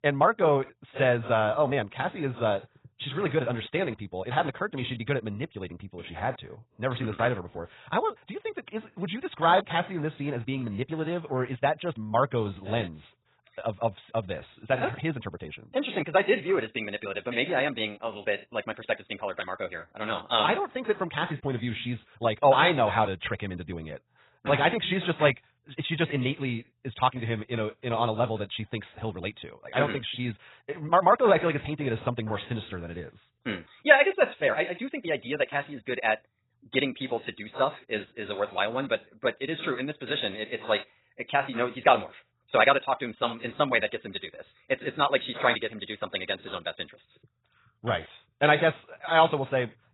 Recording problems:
garbled, watery; badly; nothing above 4 kHz
wrong speed, natural pitch; too fast; 1.6 times normal speed

